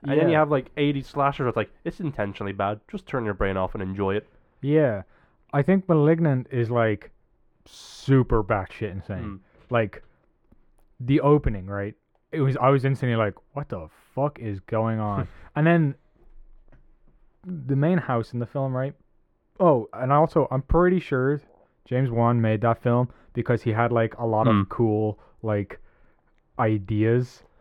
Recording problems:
muffled; very; fading above 3.5 kHz

